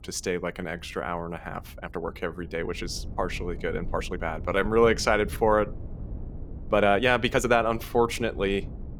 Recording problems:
low rumble; faint; throughout; 25 dB below the speech
uneven, jittery; strongly; from 0.5 to 8 s

